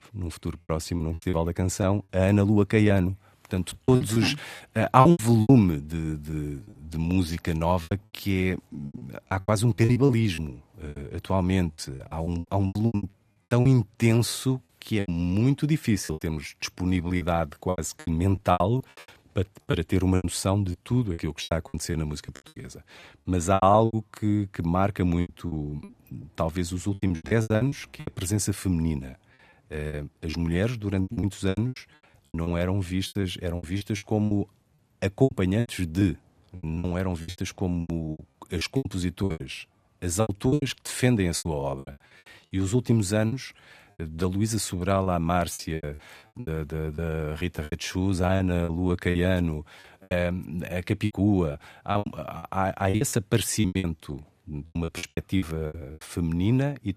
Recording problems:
choppy; very; 16% of the speech affected

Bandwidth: 14 kHz